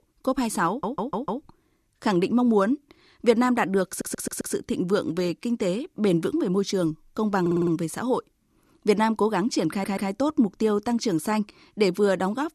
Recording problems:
audio stuttering; 4 times, first at 0.5 s

